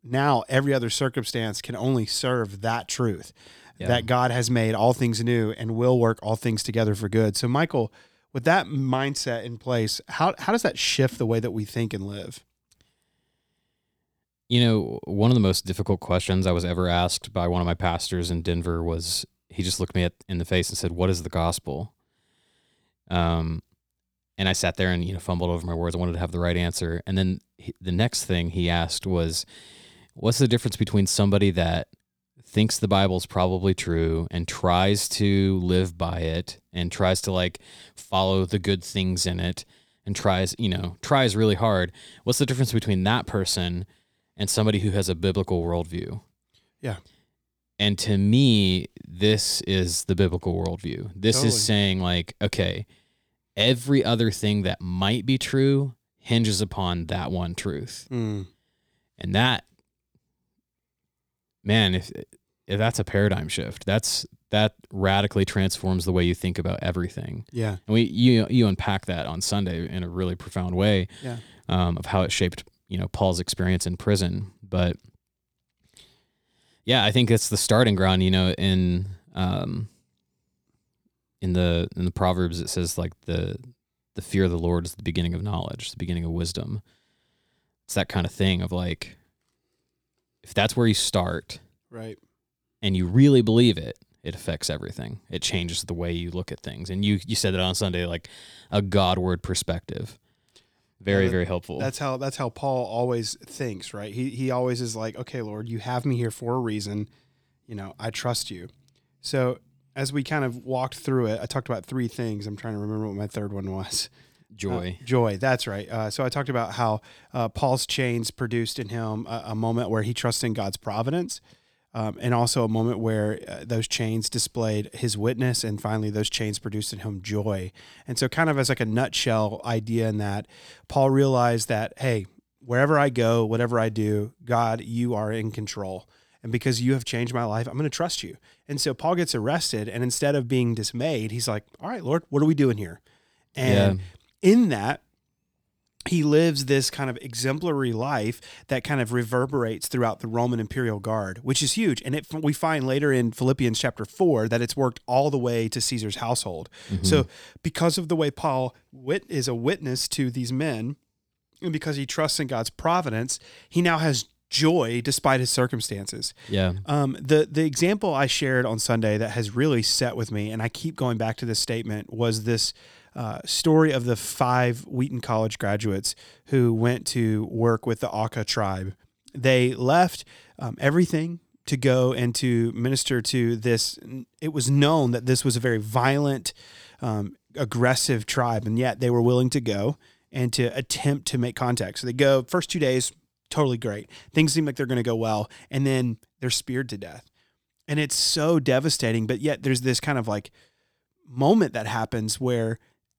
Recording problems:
none

